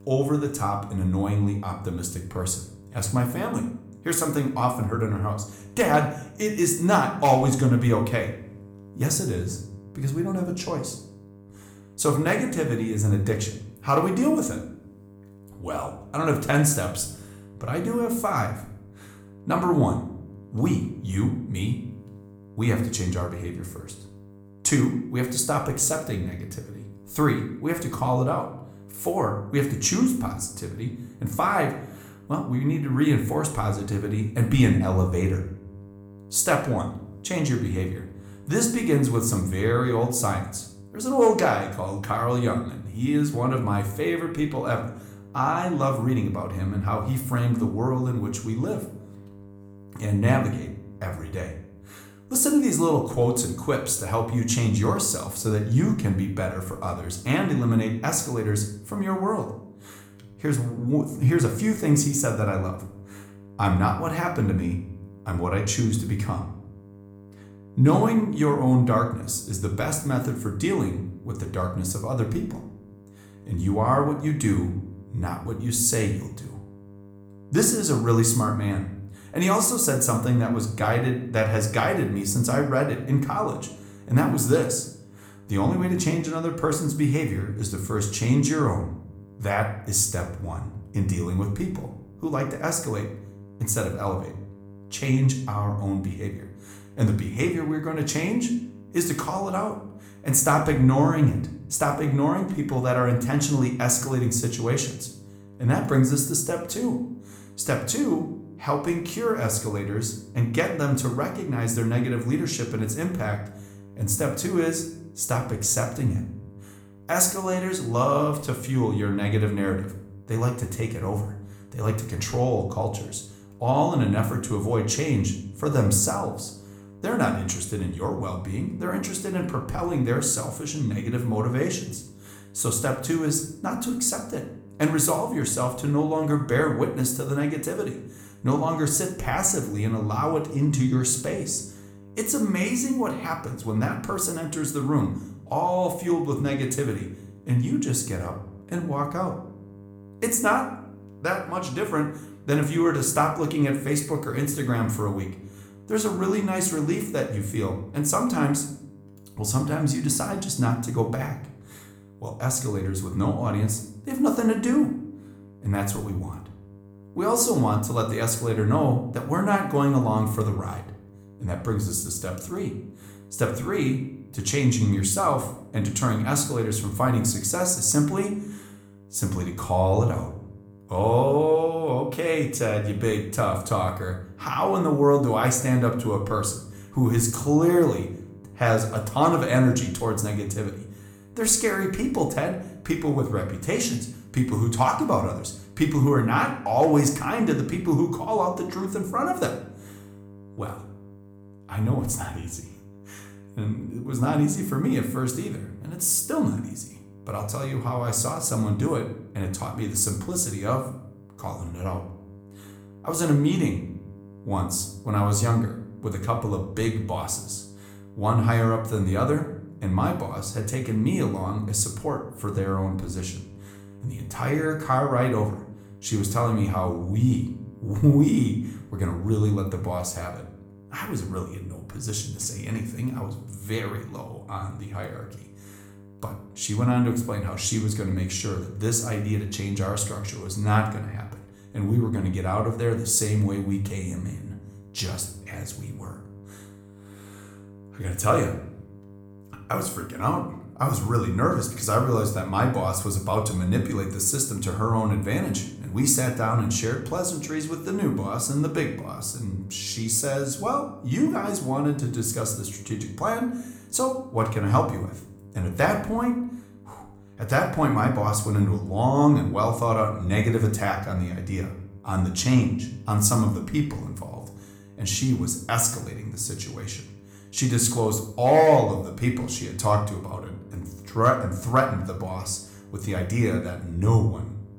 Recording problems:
room echo; slight; dies away in 0.5 s
off-mic speech; somewhat distant
electrical hum; faint; throughout; 50 Hz, 25 dB below the speech

